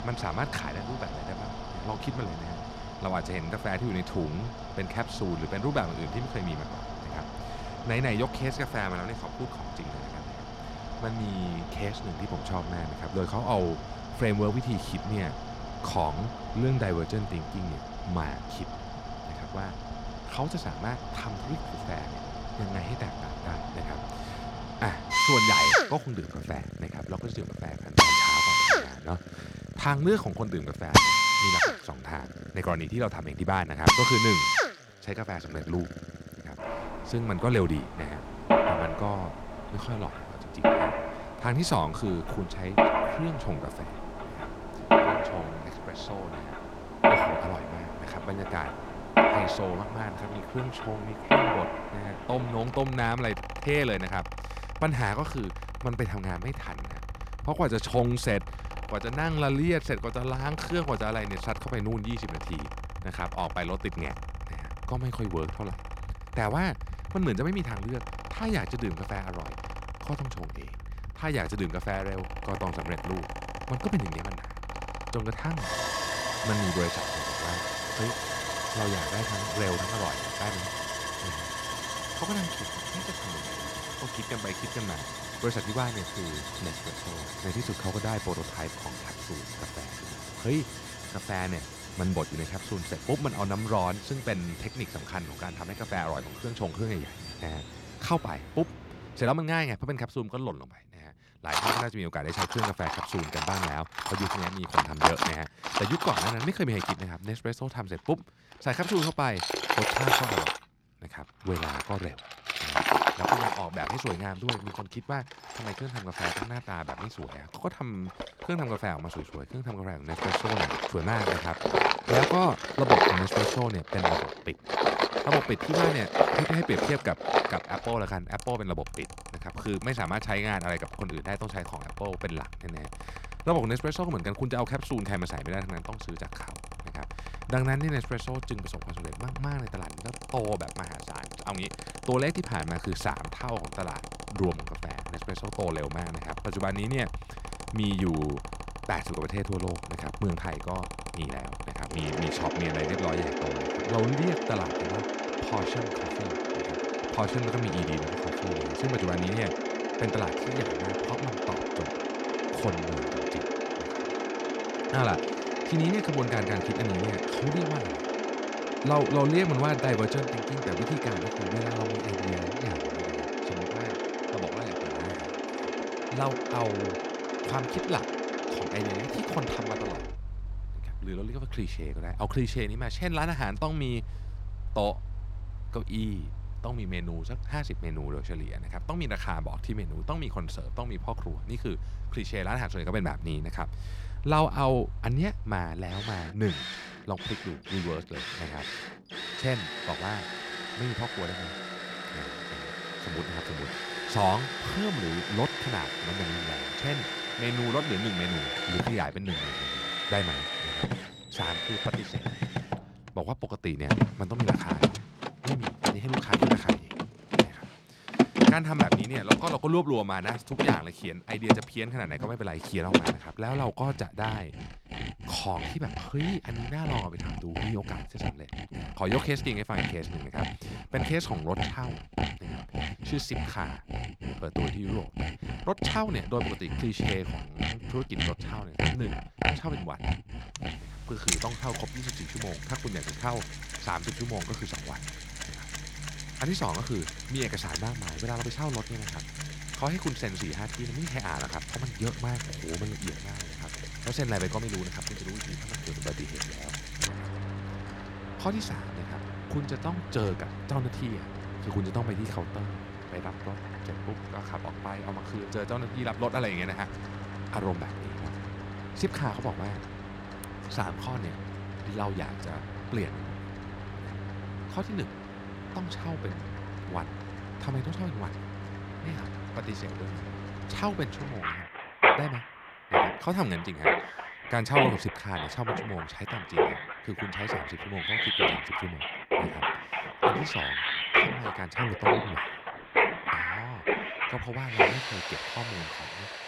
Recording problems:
machinery noise; very loud; throughout; 1 dB above the speech

